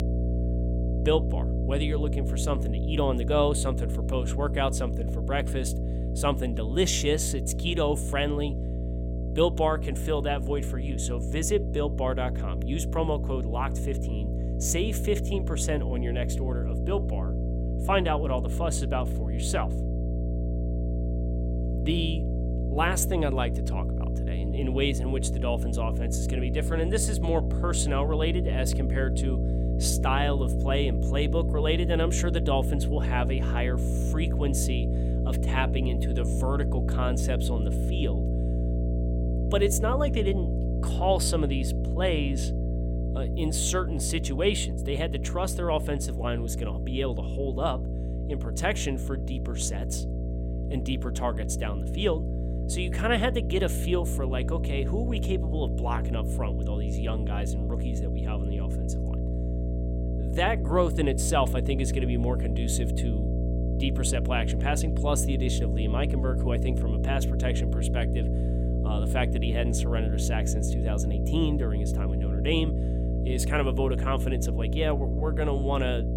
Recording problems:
electrical hum; loud; throughout; 60 Hz, 8 dB below the speech

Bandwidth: 16.5 kHz